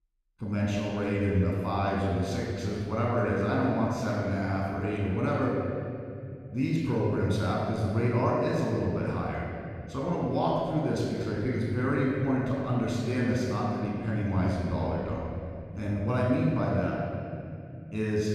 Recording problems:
room echo; strong; dies away in 2.7 s
off-mic speech; far

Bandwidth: 14.5 kHz